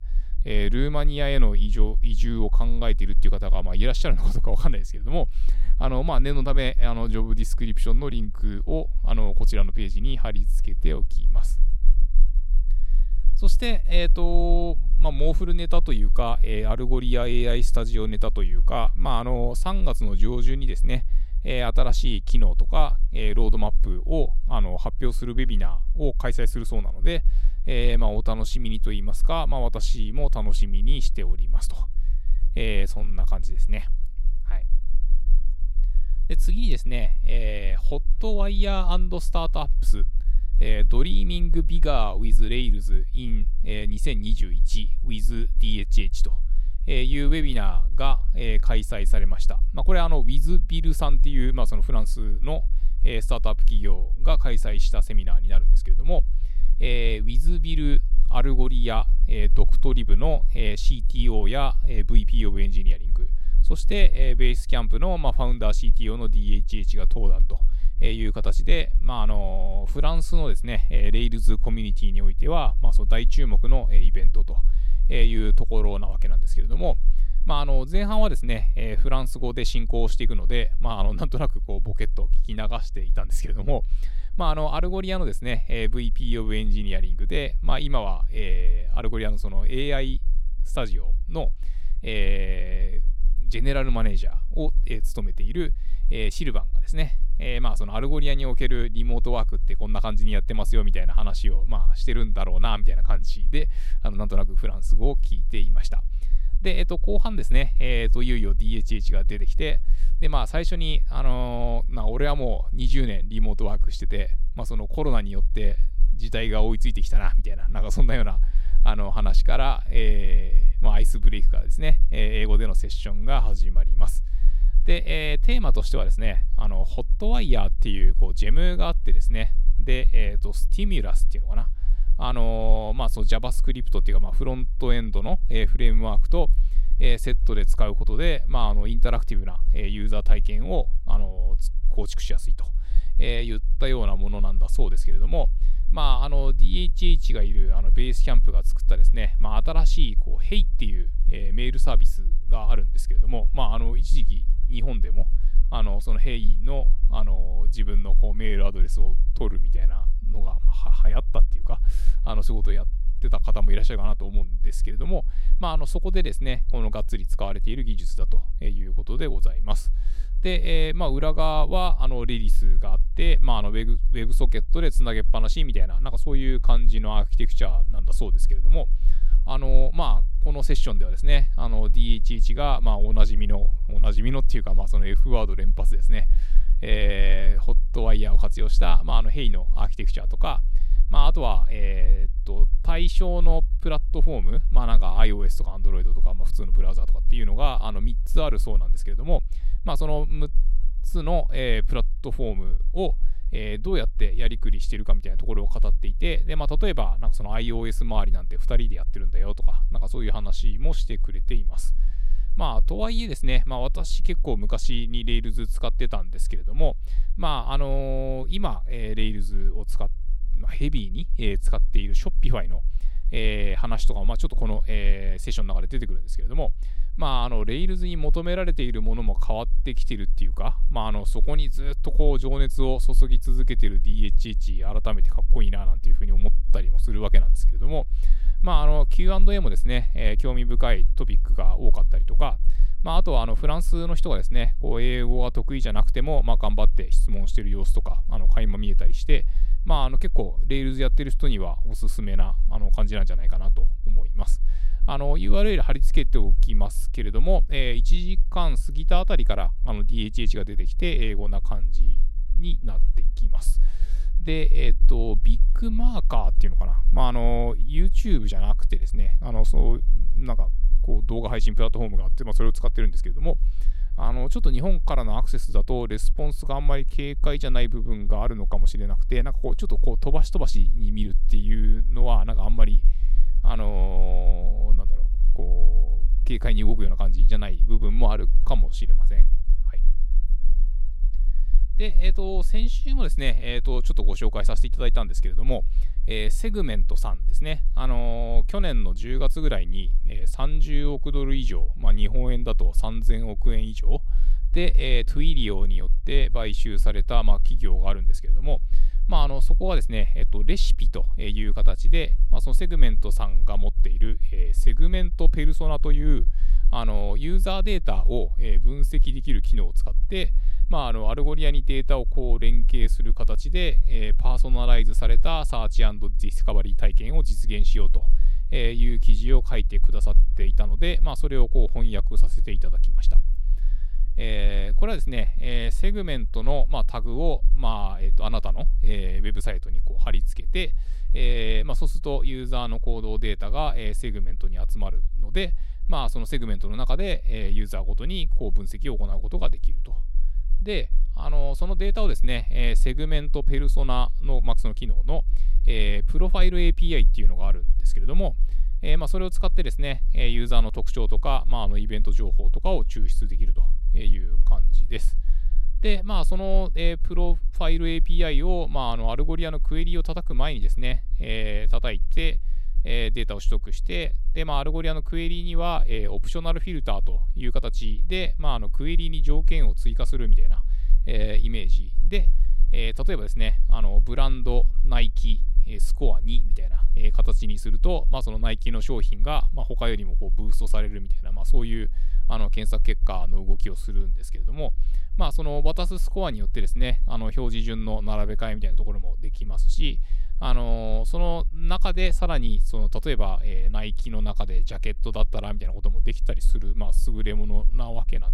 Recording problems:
low rumble; faint; throughout; 25 dB below the speech

